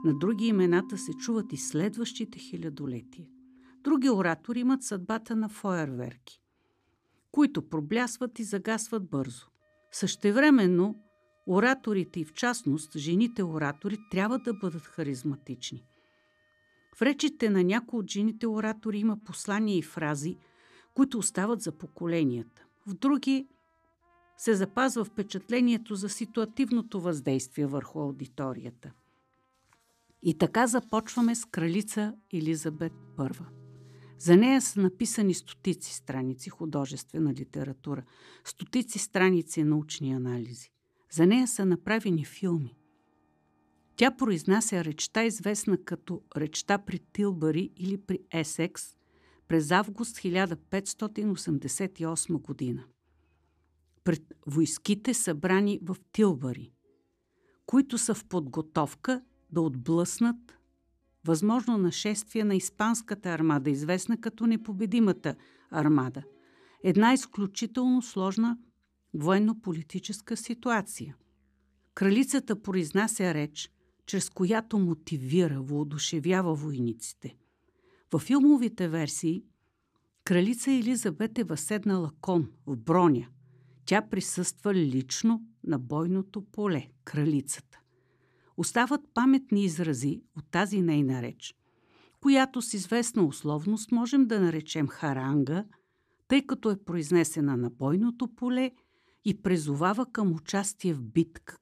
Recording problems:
background music; faint; throughout; 25 dB below the speech

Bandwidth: 14.5 kHz